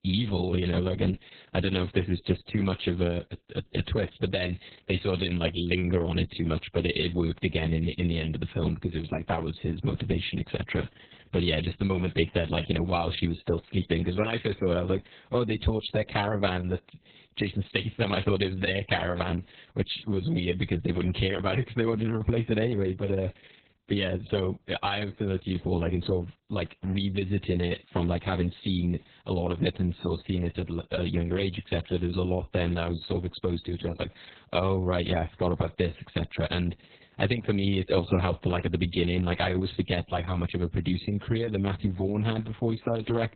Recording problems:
garbled, watery; badly; nothing above 4 kHz

